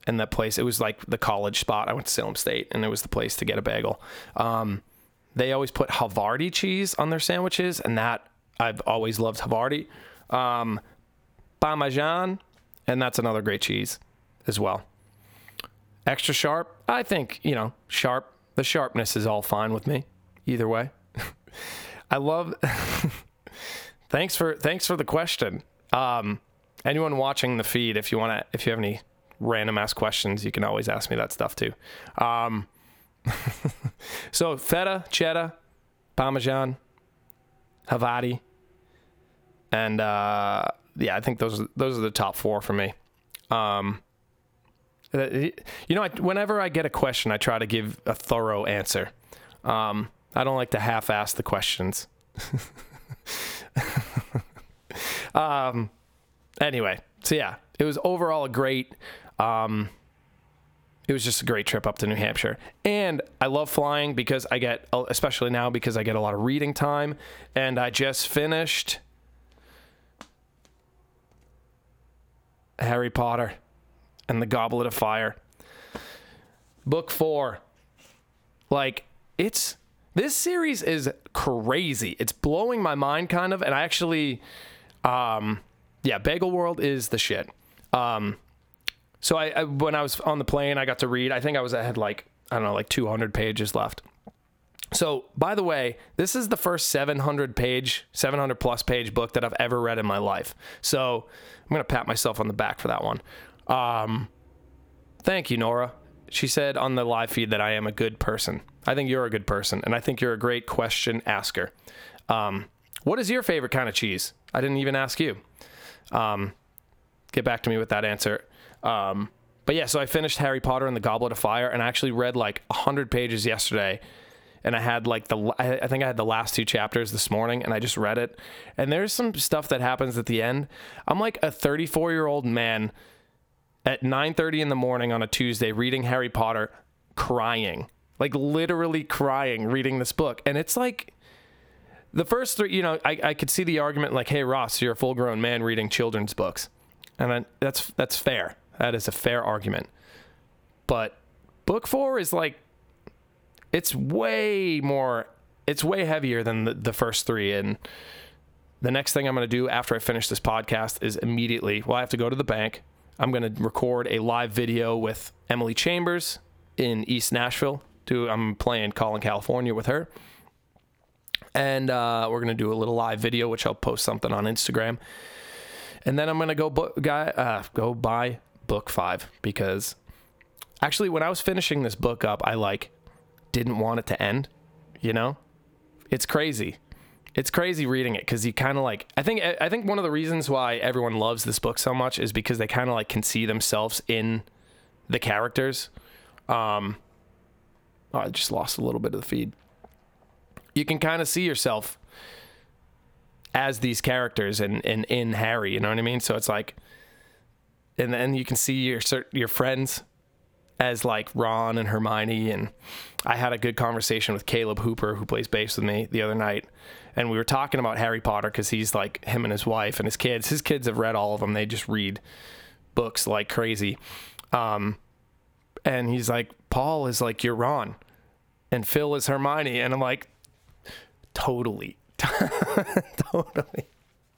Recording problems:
squashed, flat; heavily

